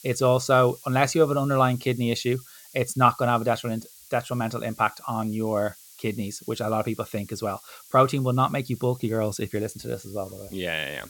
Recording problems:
hiss; faint; throughout; 20 dB below the speech

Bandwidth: 17 kHz